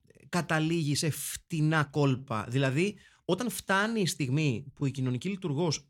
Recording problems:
uneven, jittery; strongly; from 1 to 5 s

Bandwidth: 18.5 kHz